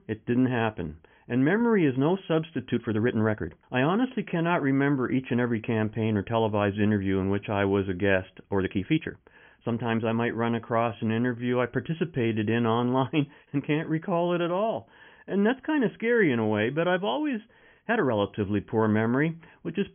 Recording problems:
high frequencies cut off; severe; nothing above 3.5 kHz
uneven, jittery; strongly; from 2.5 to 18 s

